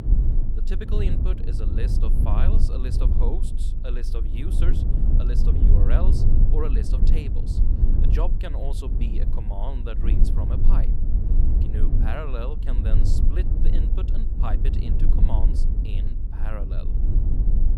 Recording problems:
low rumble; loud; throughout; 2 dB below the speech

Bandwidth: 17.5 kHz